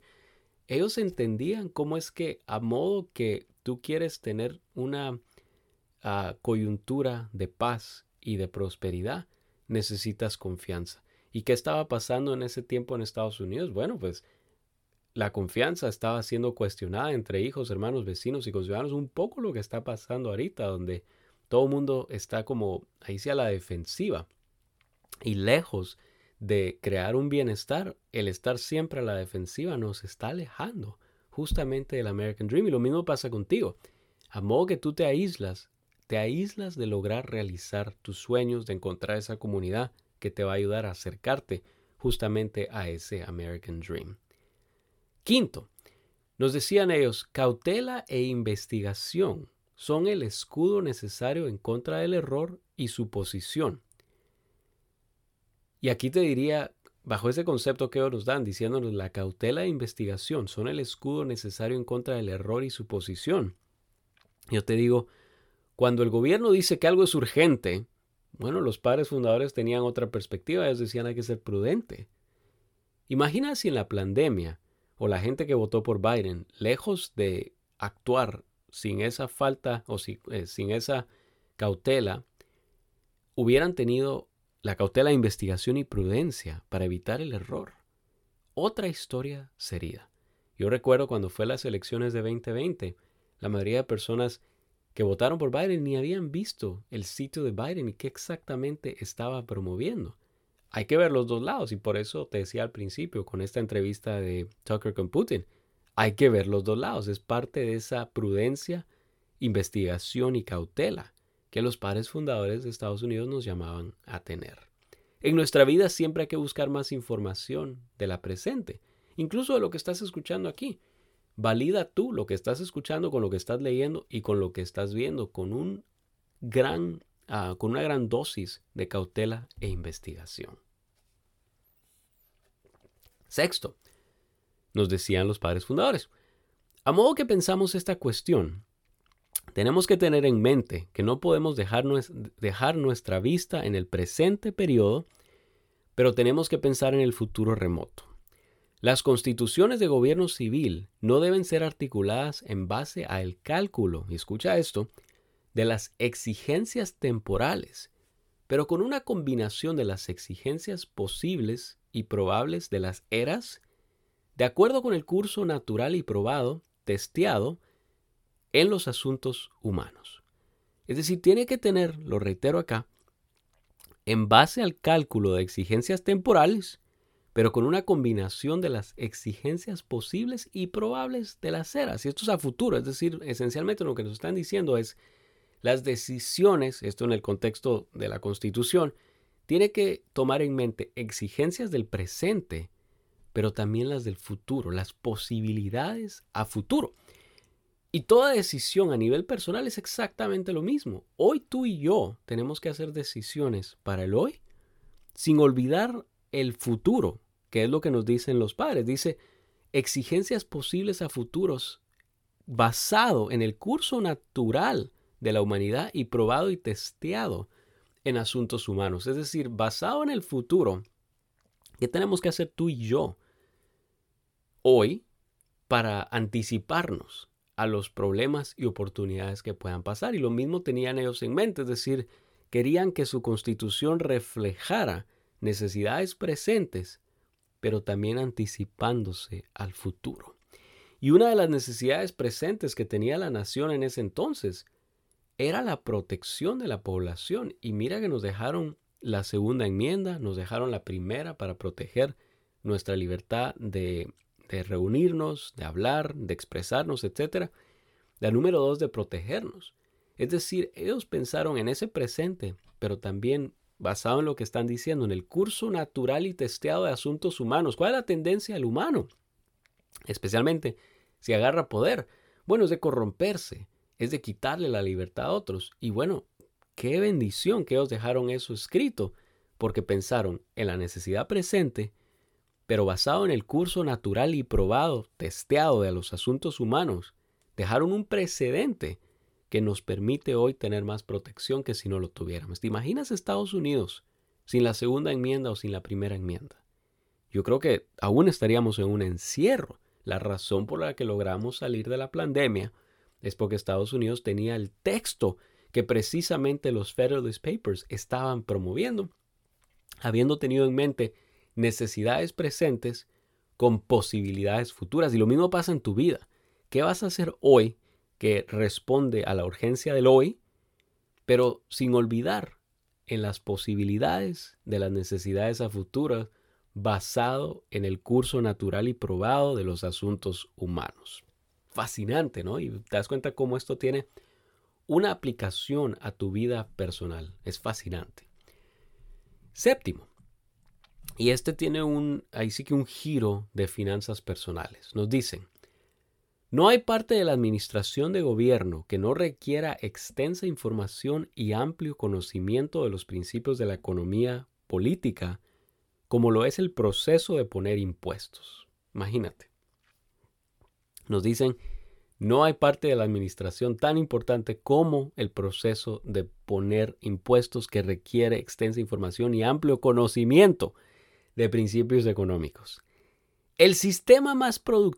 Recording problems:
none

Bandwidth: 17 kHz